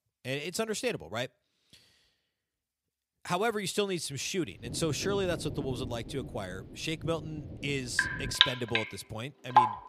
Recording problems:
rain or running water; very loud; from 4.5 s on; 4 dB above the speech

